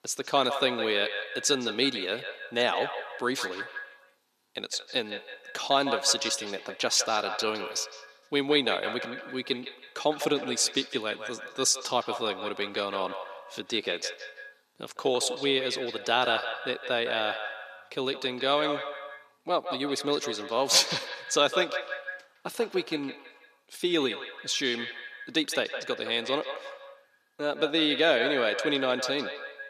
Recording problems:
echo of what is said; strong; throughout; 160 ms later, 8 dB below the speech
thin; somewhat; fading below 300 Hz

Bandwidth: 14.5 kHz